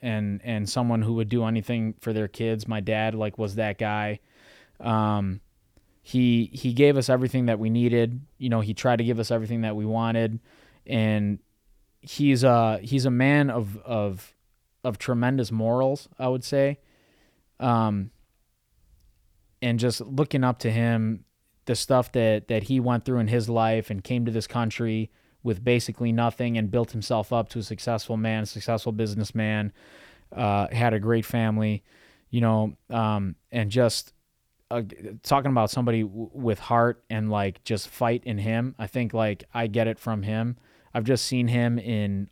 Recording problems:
none

